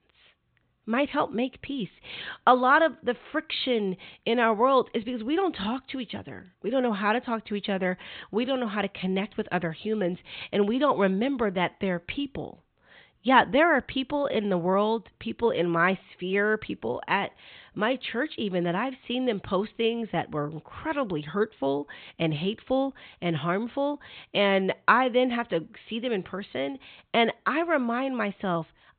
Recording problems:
high frequencies cut off; severe; nothing above 4 kHz

